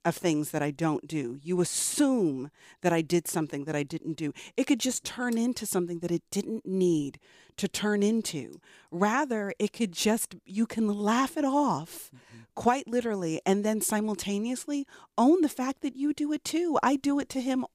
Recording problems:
none

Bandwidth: 15 kHz